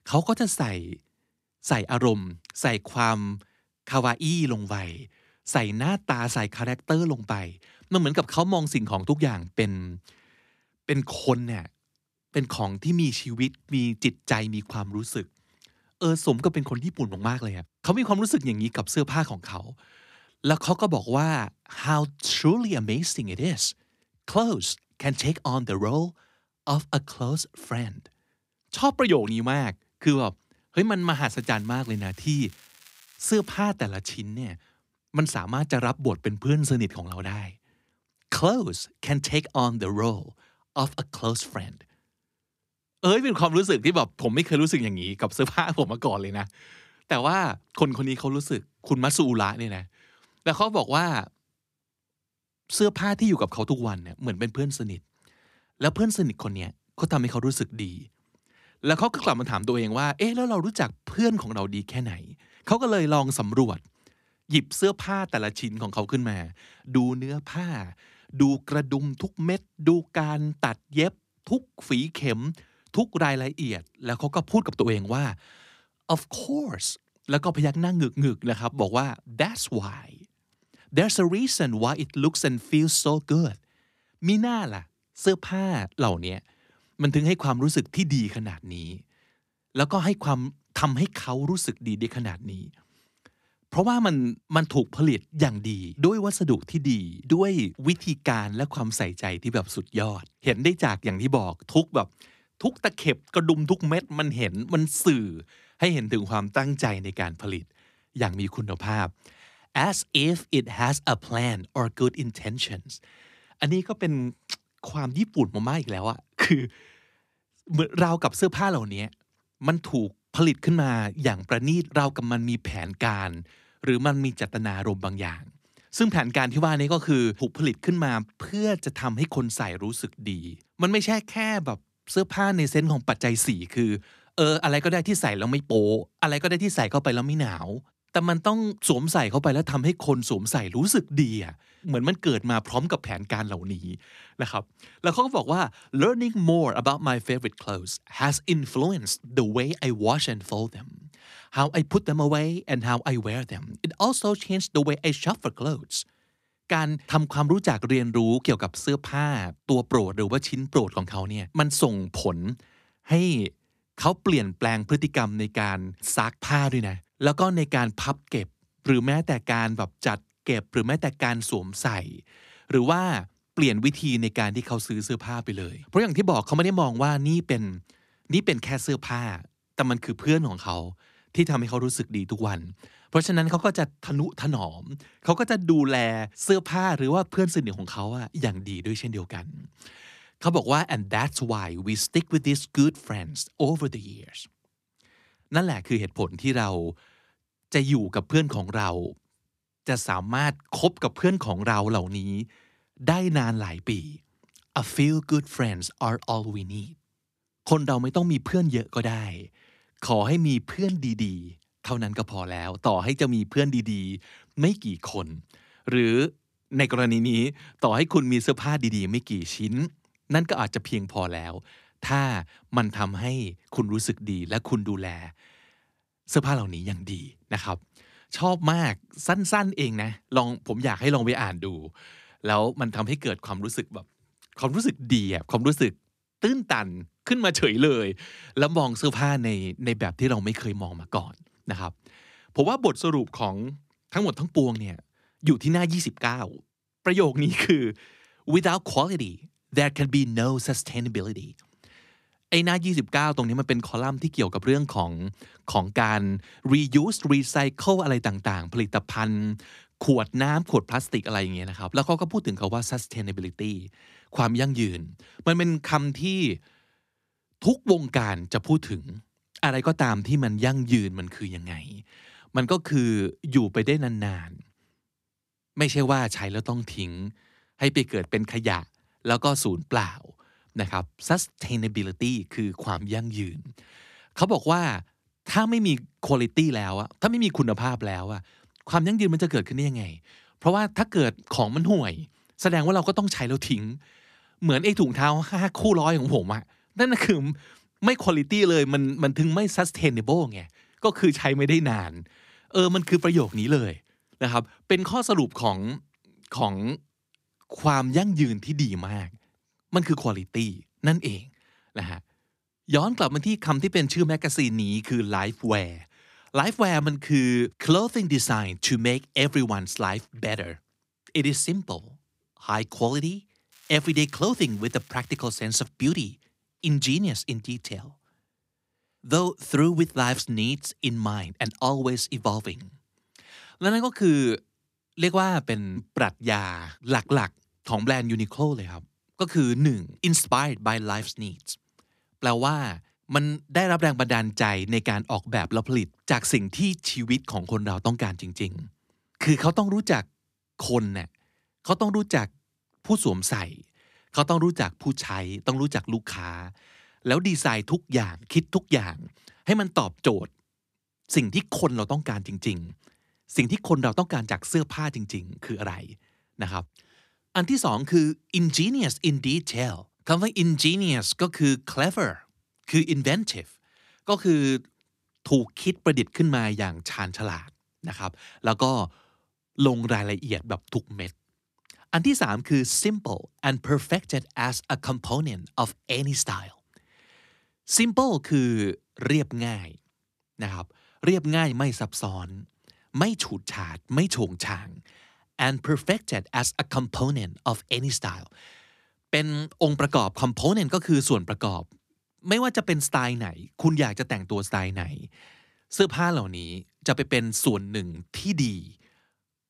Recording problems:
crackling; faint; from 31 to 34 s, at 5:03 and from 5:24 to 5:26; 25 dB below the speech

